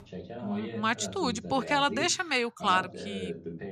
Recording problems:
voice in the background; noticeable; throughout; 10 dB below the speech

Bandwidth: 14.5 kHz